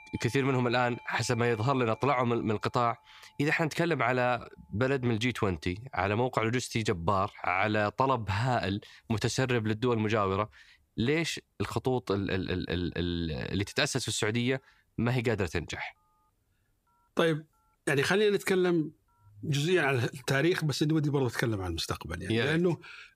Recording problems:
alarms or sirens; faint; throughout; 25 dB below the speech

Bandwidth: 15 kHz